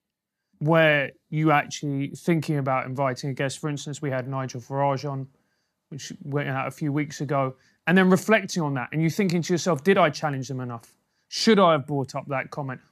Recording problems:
none

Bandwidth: 14.5 kHz